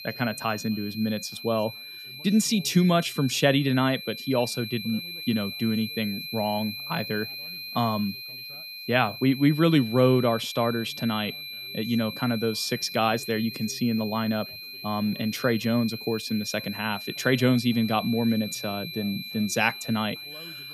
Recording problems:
high-pitched whine; loud; throughout; 4 kHz, 10 dB below the speech
background chatter; faint; throughout; 2 voices, 30 dB below the speech

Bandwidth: 14.5 kHz